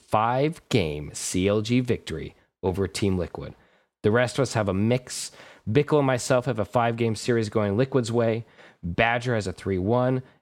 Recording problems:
none

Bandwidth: 16.5 kHz